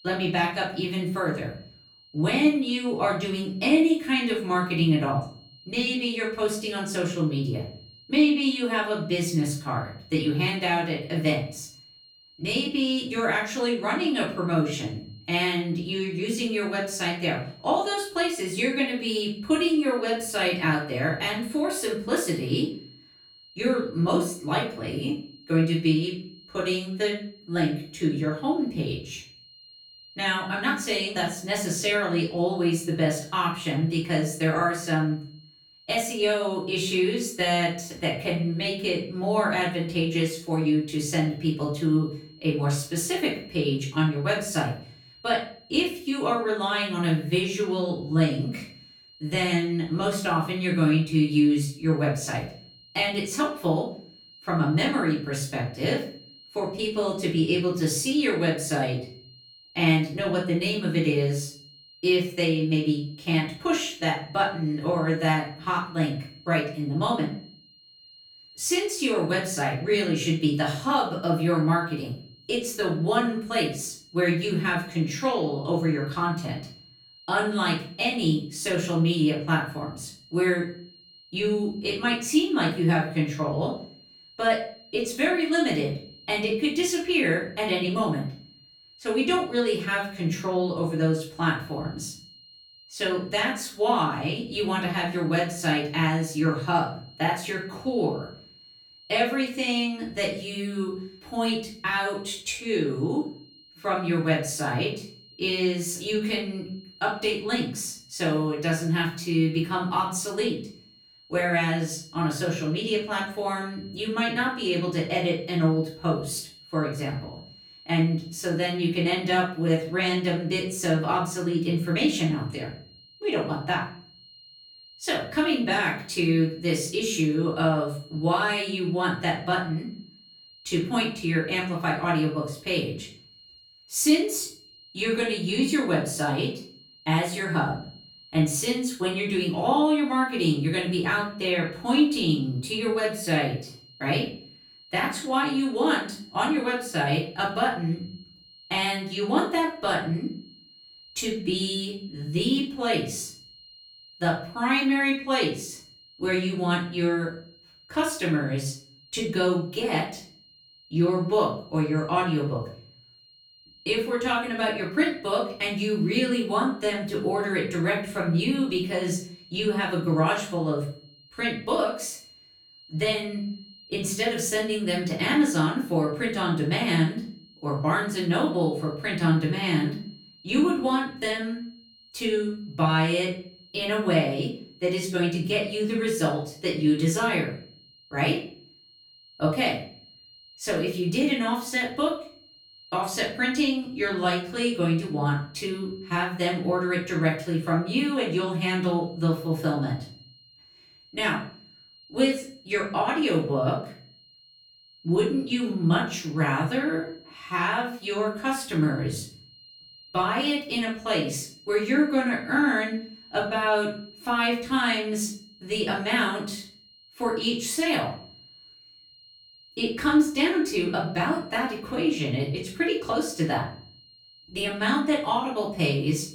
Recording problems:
off-mic speech; far
room echo; slight; dies away in 0.4 s
high-pitched whine; faint; throughout; 4 kHz, 25 dB below the speech

